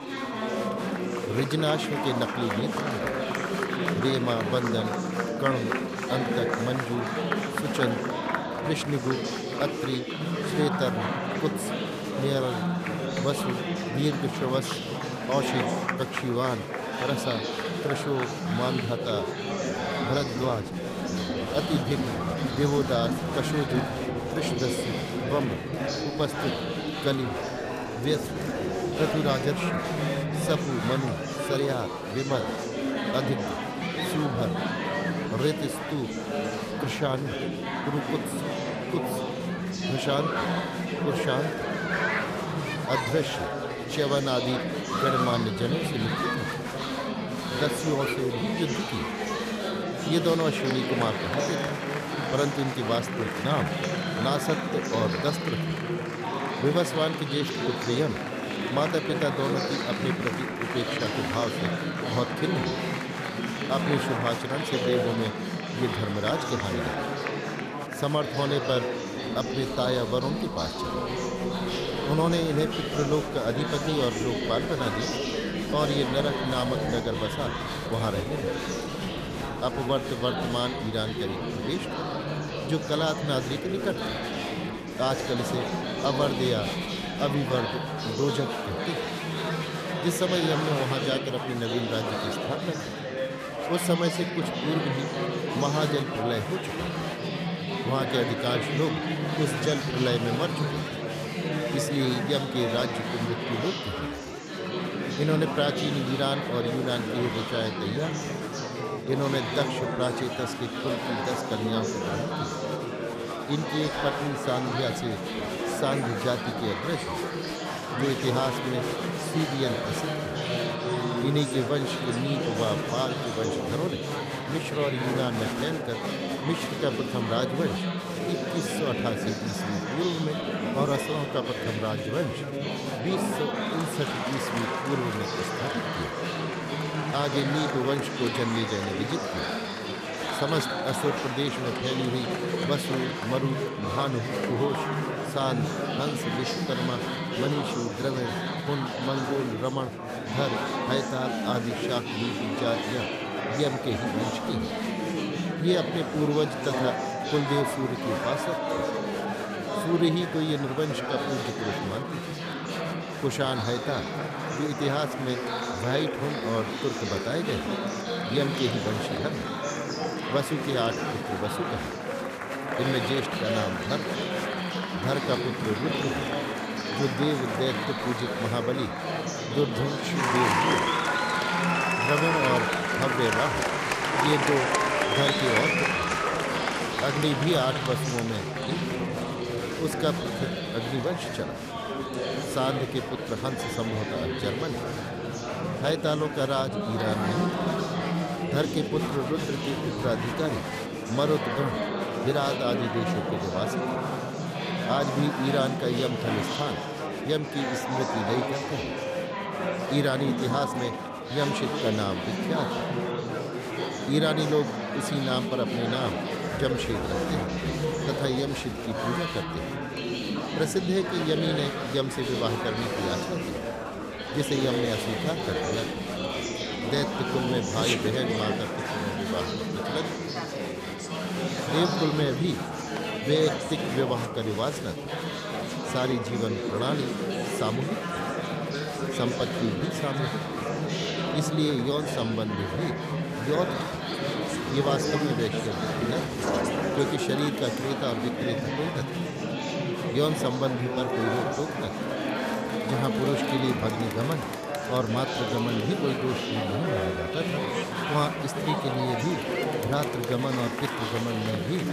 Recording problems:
chatter from many people; very loud; throughout; as loud as the speech

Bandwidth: 14.5 kHz